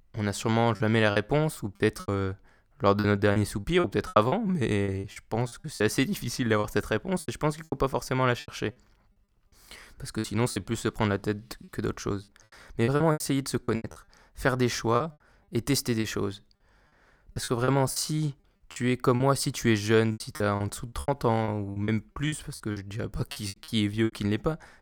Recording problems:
choppy; very; 13% of the speech affected

